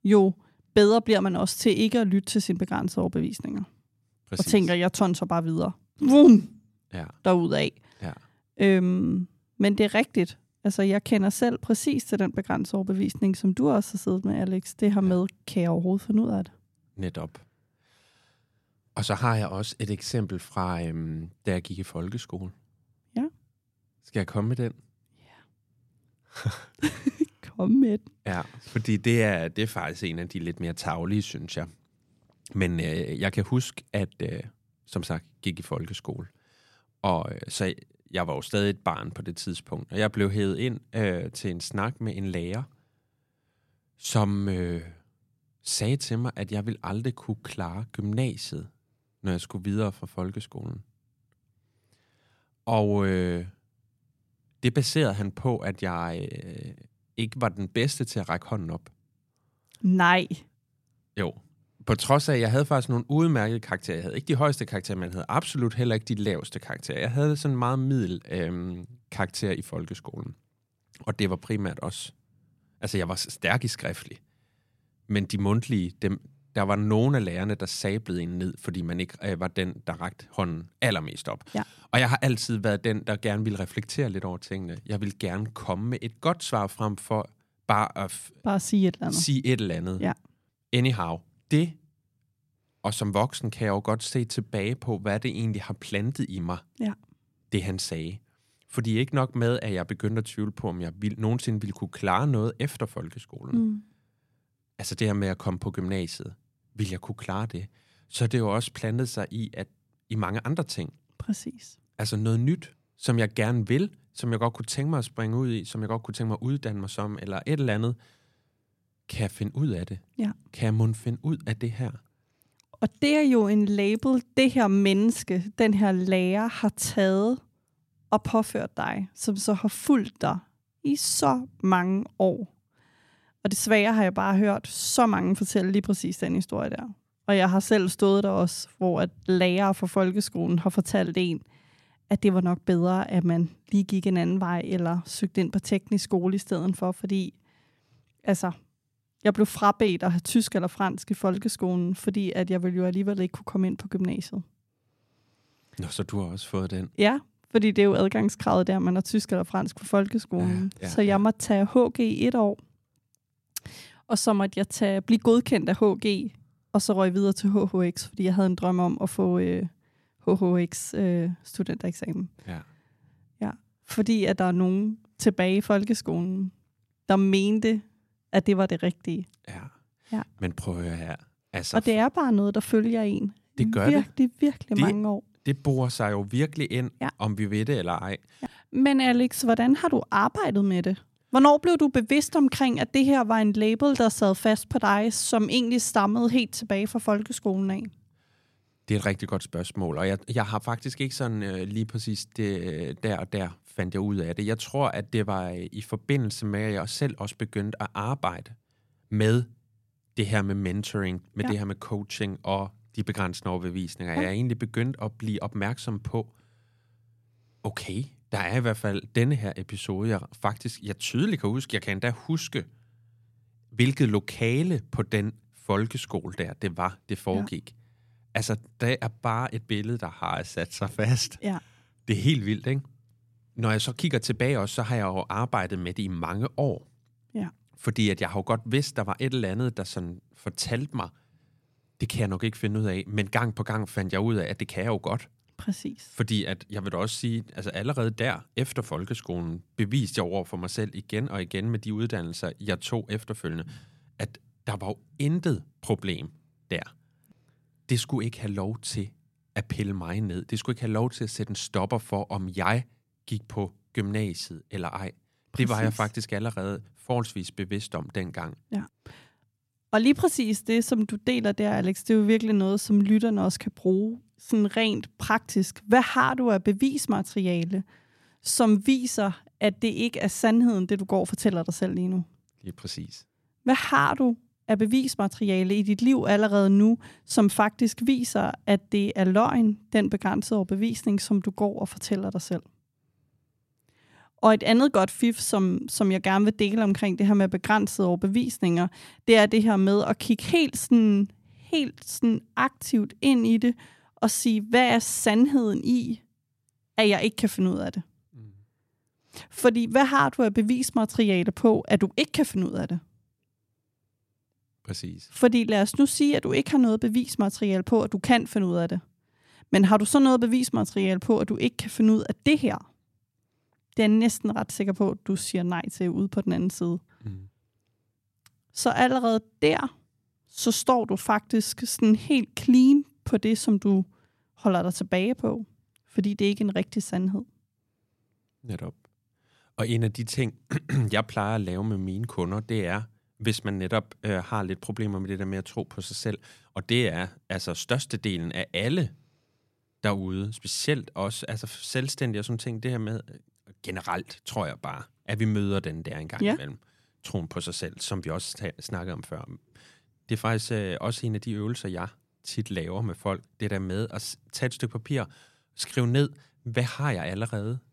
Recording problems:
none

